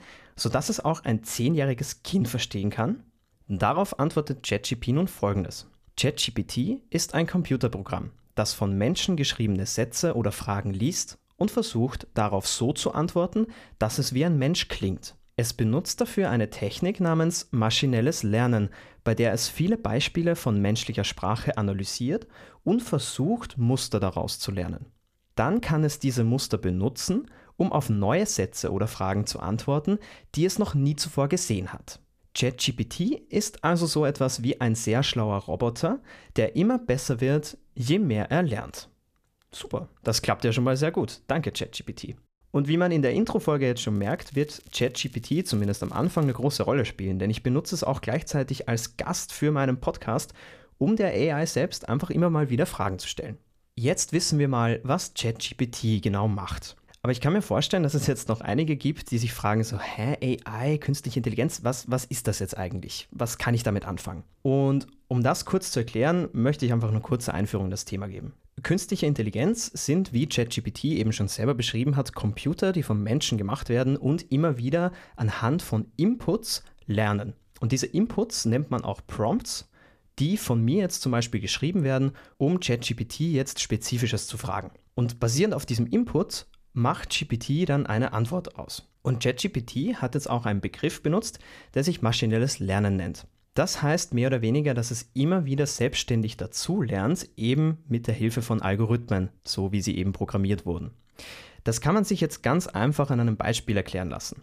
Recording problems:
crackling; faint; from 44 to 46 s; 30 dB below the speech

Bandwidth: 14.5 kHz